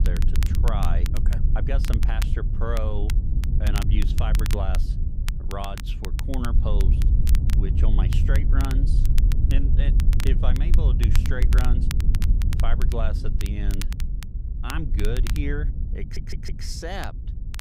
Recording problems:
wind noise on the microphone; heavy; 6 dB below the speech
crackle, like an old record; loud; 6 dB below the speech
audio stuttering; at 16 s

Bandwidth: 15.5 kHz